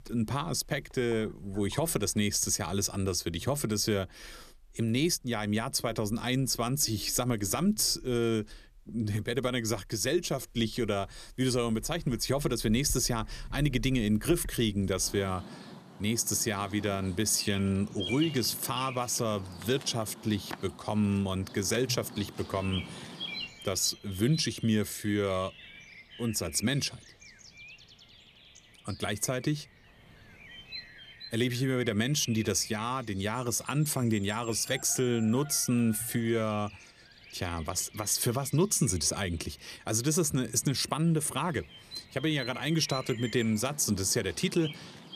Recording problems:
animal sounds; noticeable; throughout; 15 dB below the speech

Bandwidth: 14.5 kHz